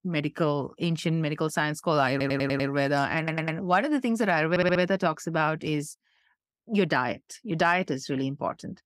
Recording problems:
audio stuttering; at 2 s, at 3 s and at 4.5 s

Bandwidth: 15.5 kHz